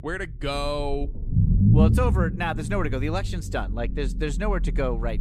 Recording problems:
low rumble; loud; throughout; 7 dB below the speech

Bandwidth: 14.5 kHz